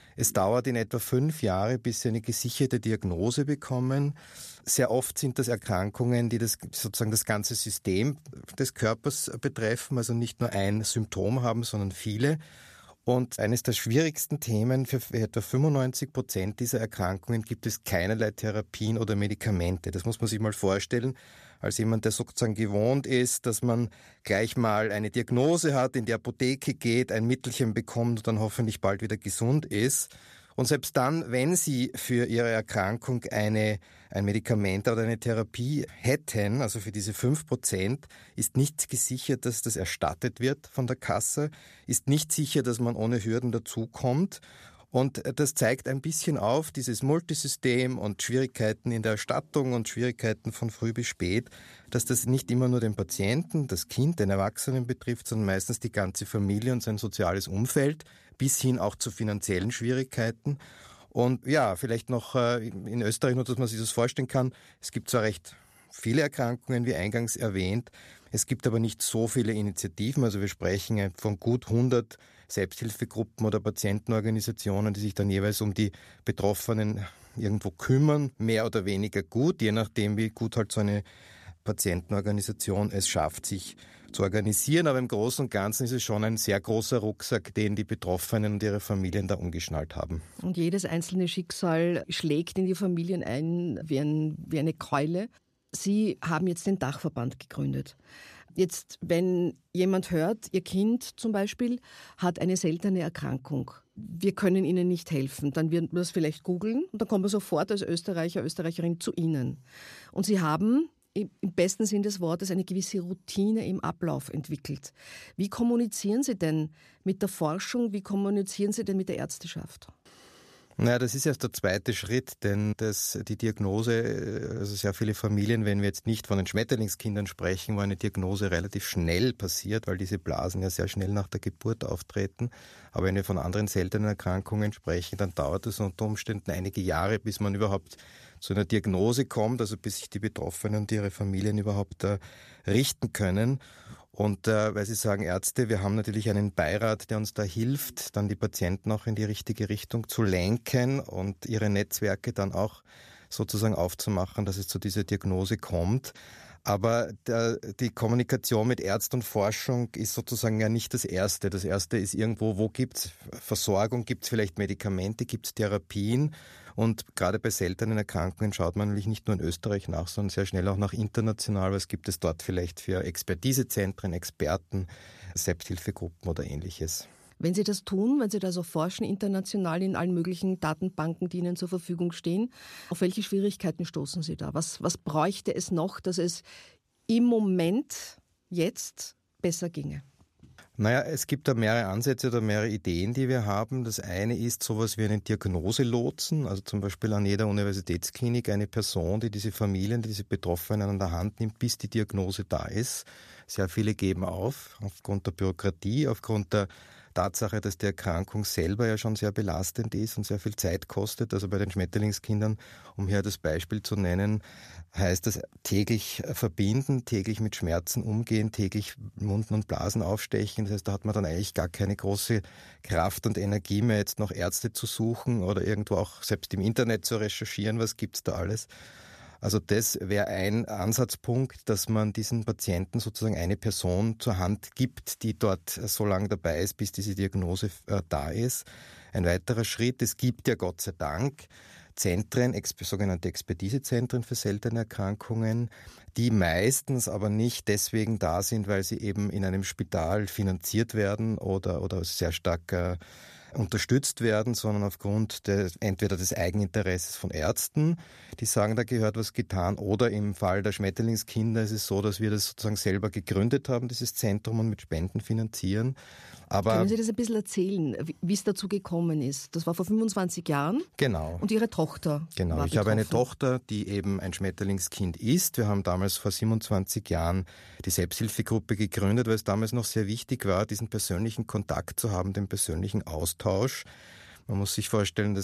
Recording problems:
abrupt cut into speech; at the end

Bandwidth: 14.5 kHz